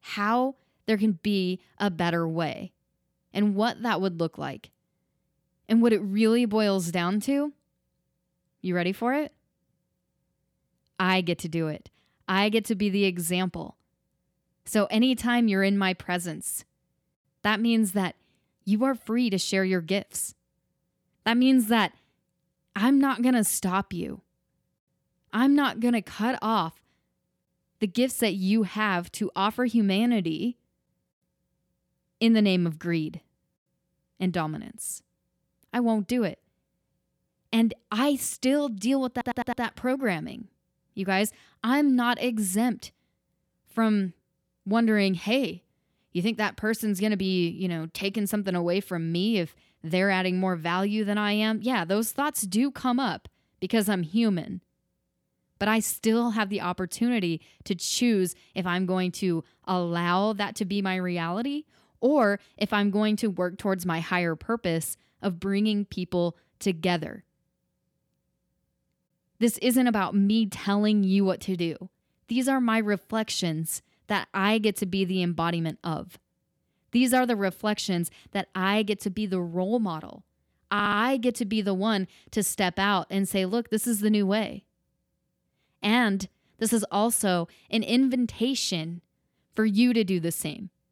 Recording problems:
audio stuttering; at 39 s and at 1:21

